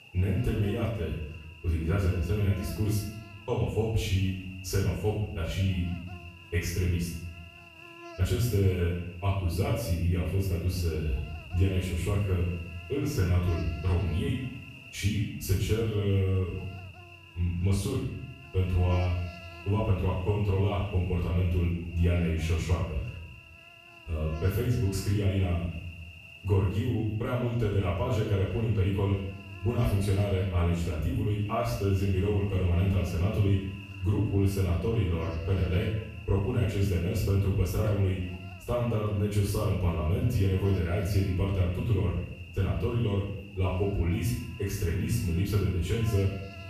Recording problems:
off-mic speech; far
room echo; noticeable; dies away in 0.7 s
electrical hum; noticeable; throughout; 60 Hz, 10 dB below the speech

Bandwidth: 14.5 kHz